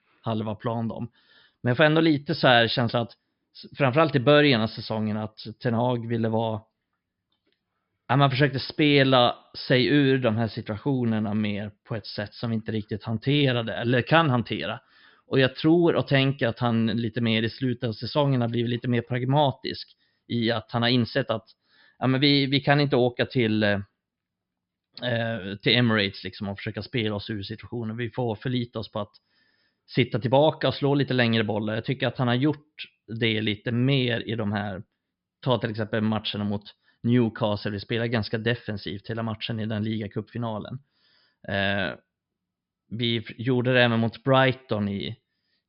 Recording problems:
high frequencies cut off; noticeable; nothing above 5.5 kHz

